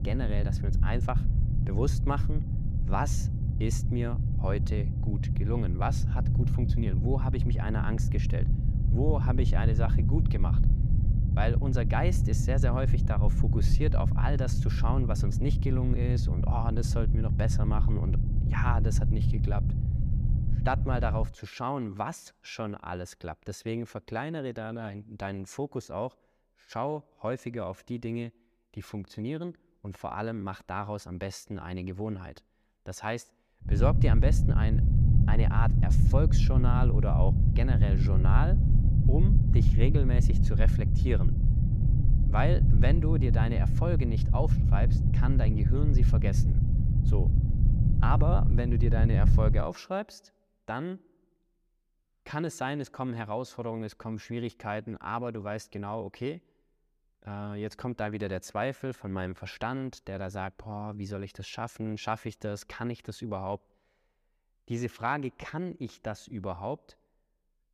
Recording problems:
low rumble; loud; until 21 s and from 34 to 50 s; 4 dB below the speech

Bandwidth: 14.5 kHz